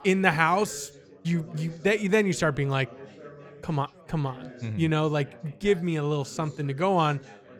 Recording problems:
background chatter; faint; throughout; 4 voices, 20 dB below the speech

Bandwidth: 18 kHz